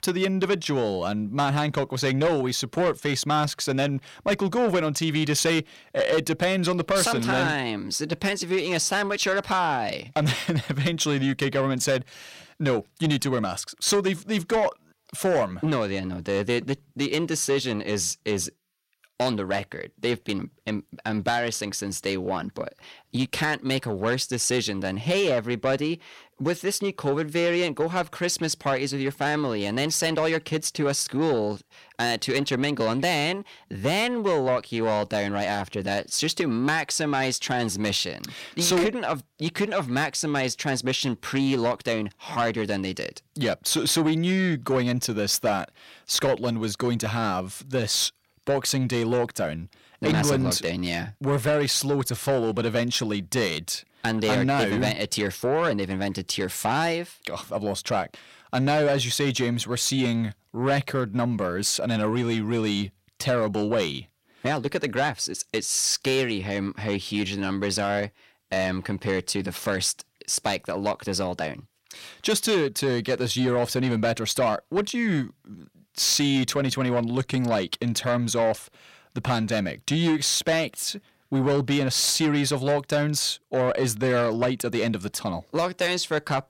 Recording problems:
distortion; slight; 10 dB below the speech

